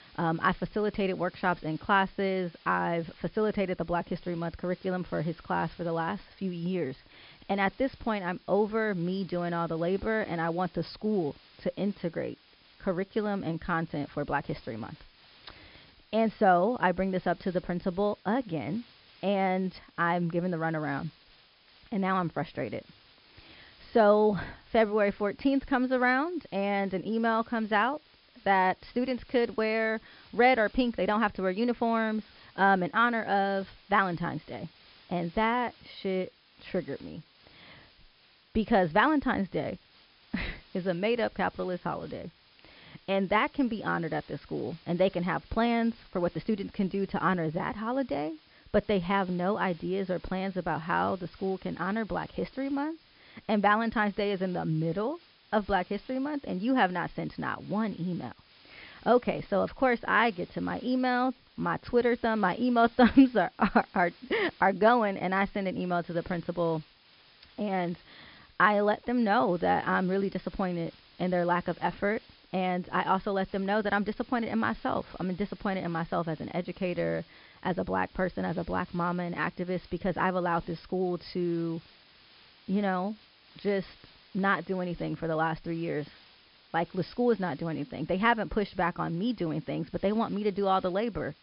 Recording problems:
high frequencies cut off; noticeable; nothing above 5.5 kHz
hiss; faint; throughout; 25 dB below the speech

